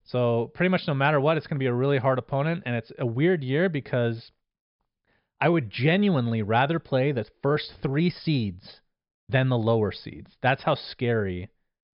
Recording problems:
high frequencies cut off; noticeable; nothing above 5.5 kHz

